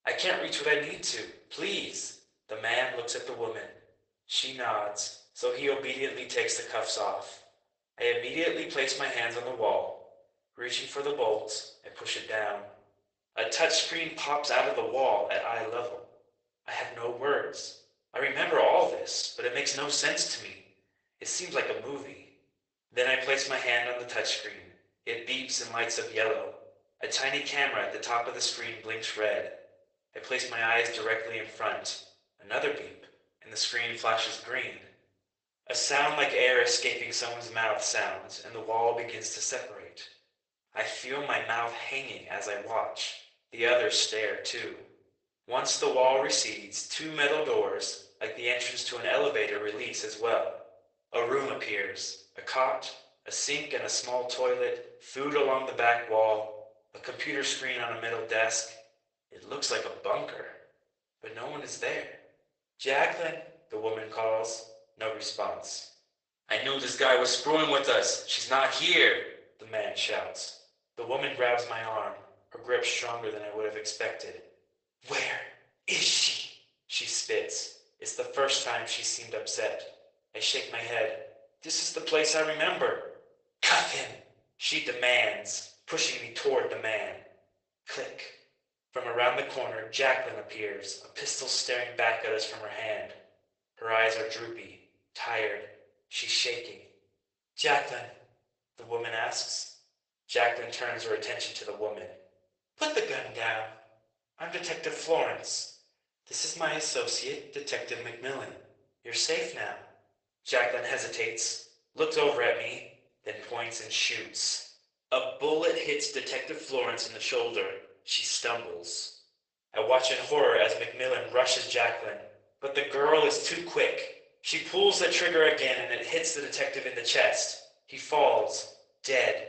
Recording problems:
garbled, watery; badly; nothing above 8 kHz
thin; very; fading below 550 Hz
room echo; slight; dies away in 0.5 s
off-mic speech; somewhat distant

